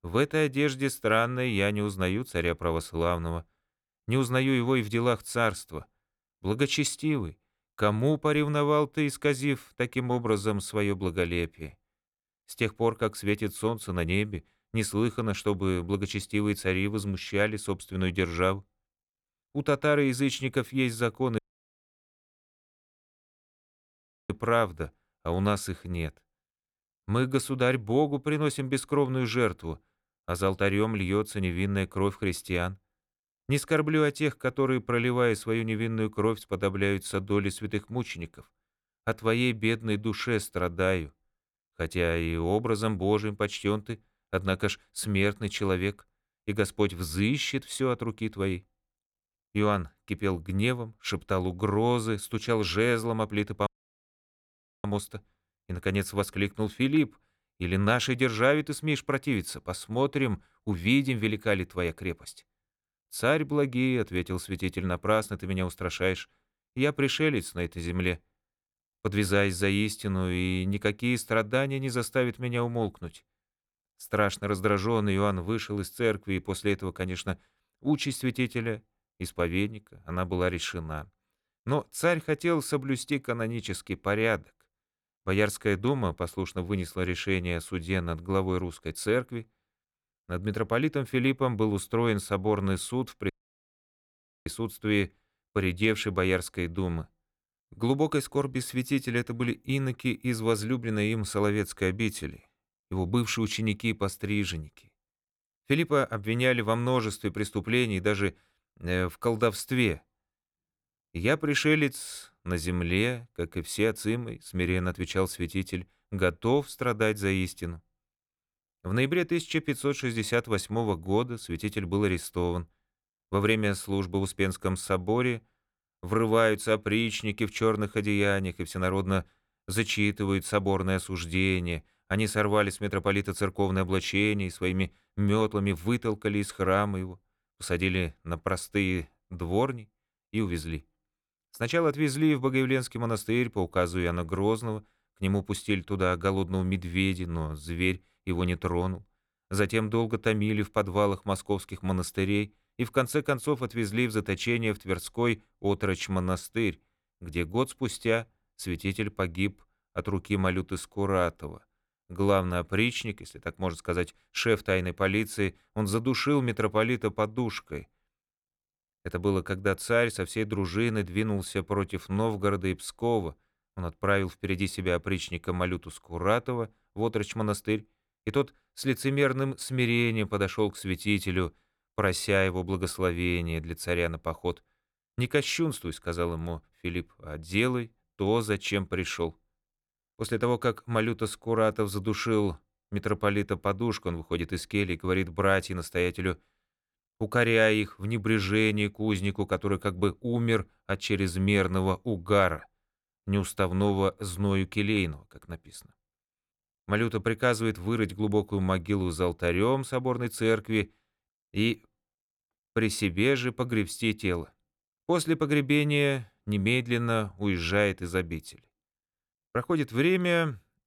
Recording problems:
audio cutting out; at 21 s for 3 s, at 54 s for 1 s and at 1:33 for 1 s

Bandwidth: 18.5 kHz